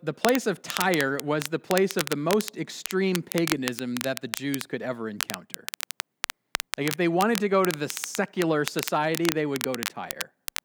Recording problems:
crackle, like an old record; loud; 6 dB below the speech

